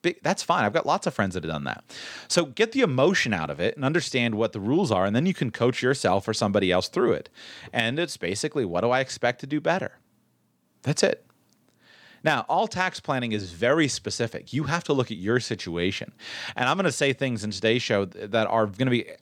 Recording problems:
none

